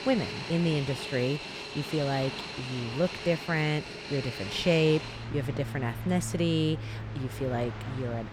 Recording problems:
train or aircraft noise; loud; throughout; 7 dB below the speech

